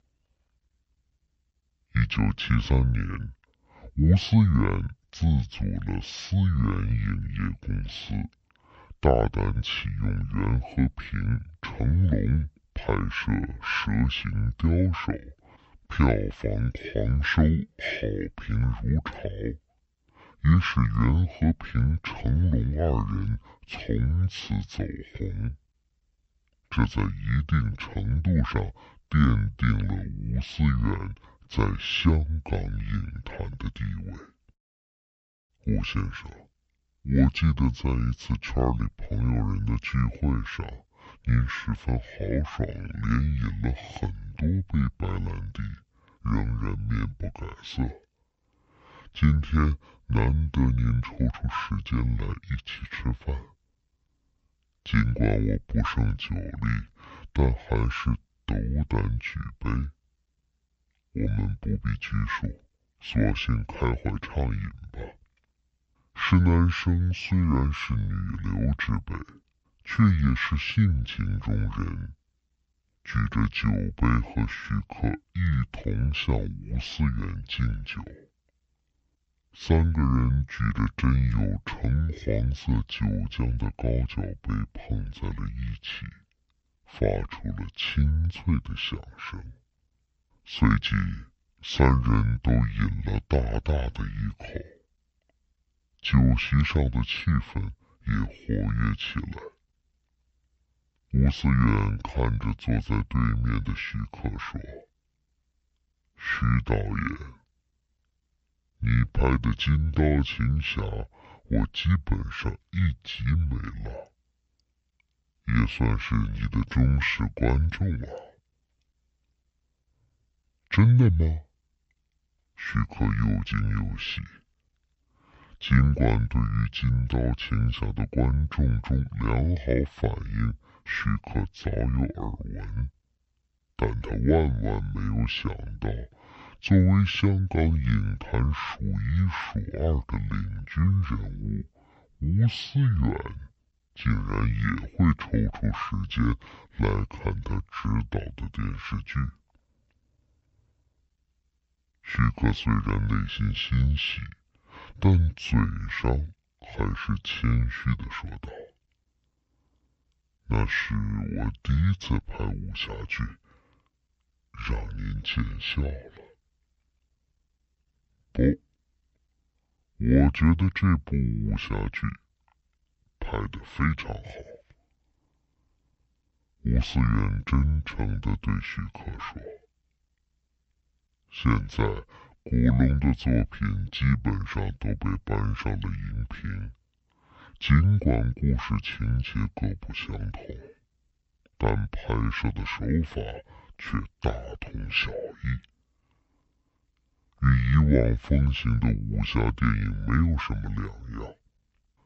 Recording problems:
wrong speed and pitch; too slow and too low; 0.6 times normal speed

